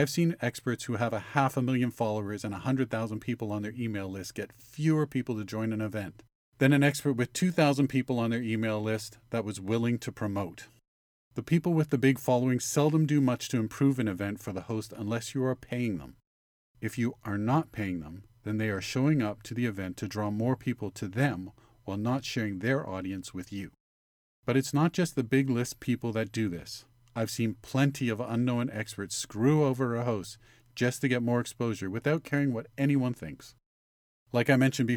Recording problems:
abrupt cut into speech; at the start and the end

